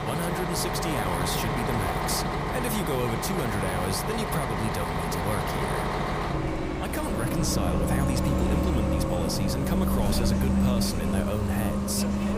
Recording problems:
traffic noise; very loud; throughout; 3 dB above the speech
train or aircraft noise; noticeable; throughout; 10 dB below the speech

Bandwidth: 15 kHz